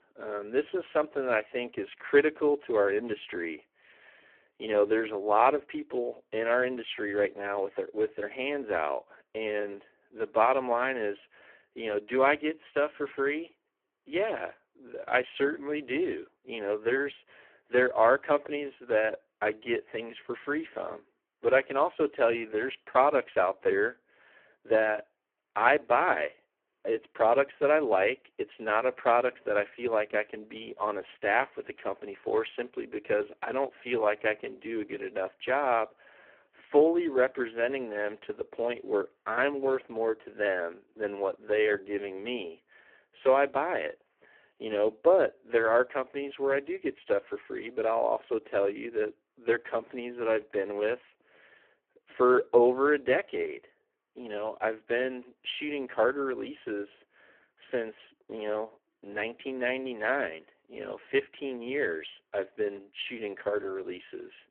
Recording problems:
phone-call audio; poor line

